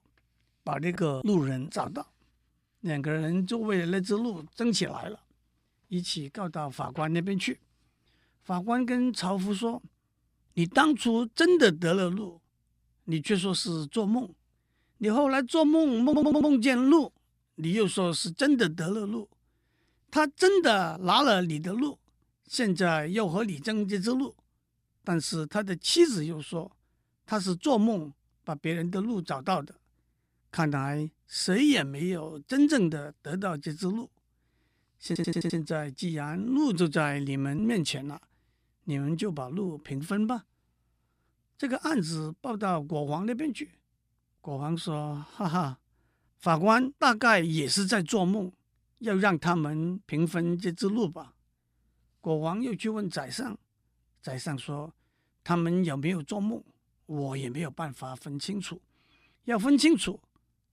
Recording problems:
audio stuttering; at 16 s and at 35 s

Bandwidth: 15 kHz